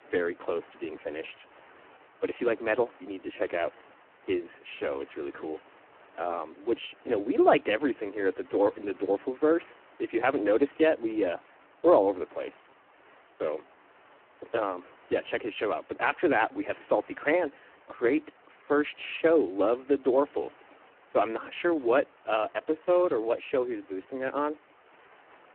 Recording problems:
phone-call audio; poor line
hiss; faint; throughout; 25 dB below the speech

